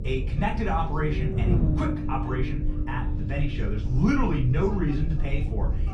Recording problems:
off-mic speech; far
room echo; slight; dies away in 0.3 s
low rumble; loud; throughout; 8 dB below the speech
electrical hum; noticeable; throughout; 50 Hz, 15 dB below the speech
background chatter; faint; throughout; 4 voices, 25 dB below the speech

